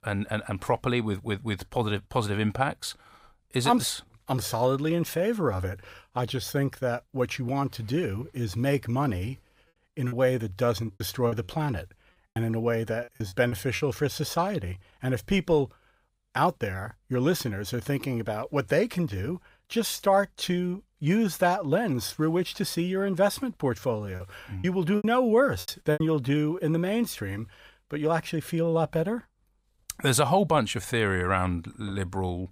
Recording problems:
choppy; very; from 10 to 14 s and from 24 to 26 s; 12% of the speech affected

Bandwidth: 15.5 kHz